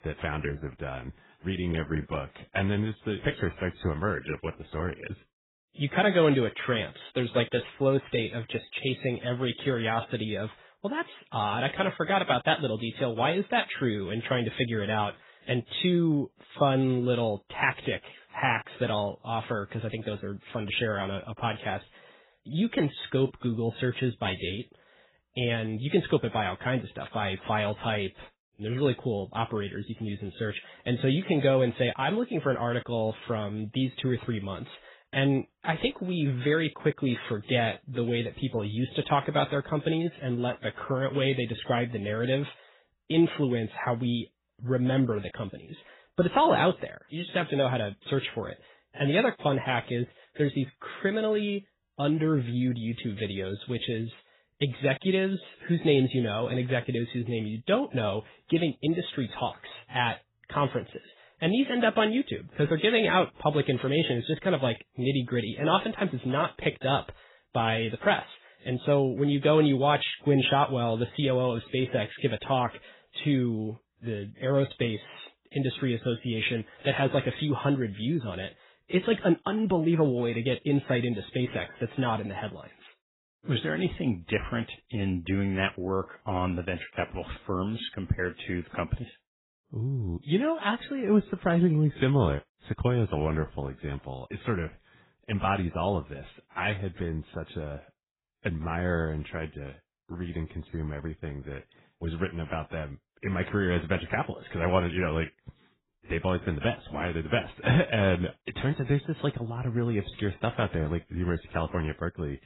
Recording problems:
garbled, watery; badly; nothing above 4 kHz

